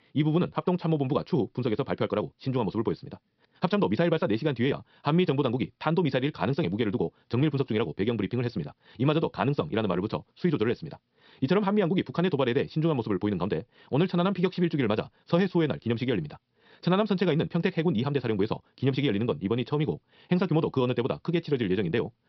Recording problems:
wrong speed, natural pitch; too fast; 1.5 times normal speed
high frequencies cut off; noticeable; nothing above 5.5 kHz

